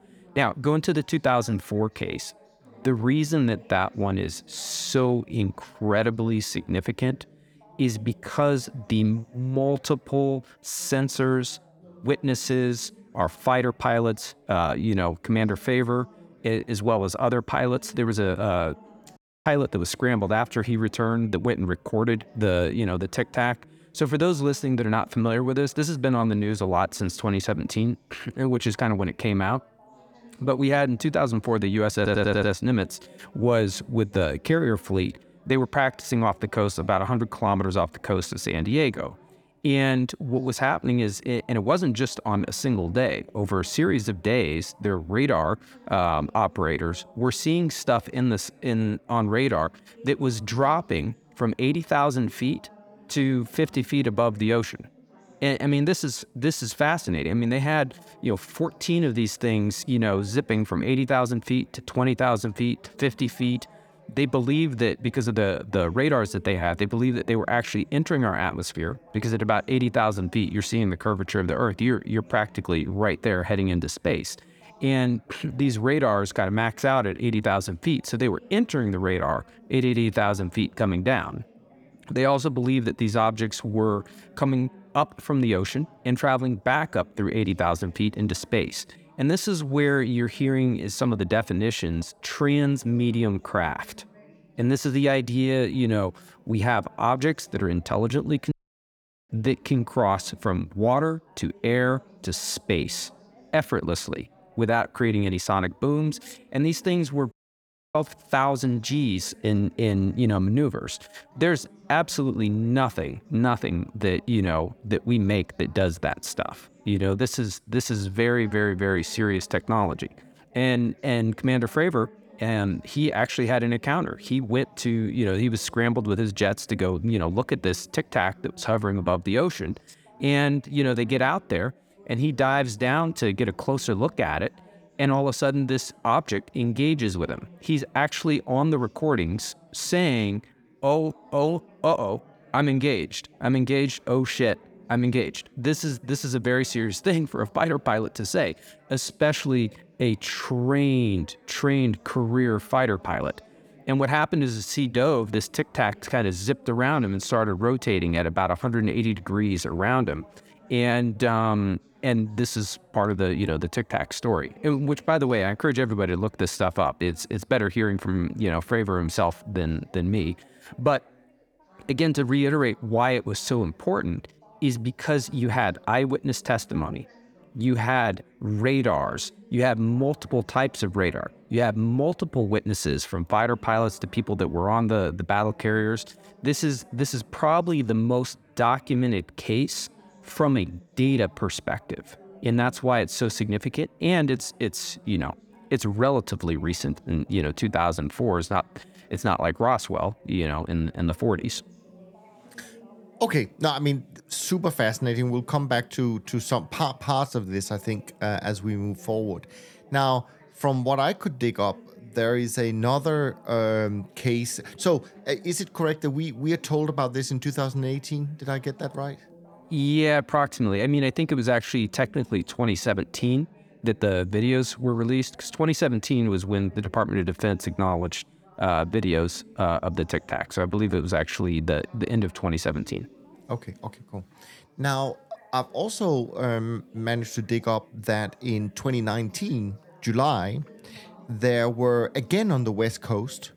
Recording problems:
background chatter; faint; throughout; 4 voices, 25 dB below the speech
audio cutting out; at 19 s, at 1:39 for 1 s and at 1:47 for 0.5 s
audio stuttering; at 32 s

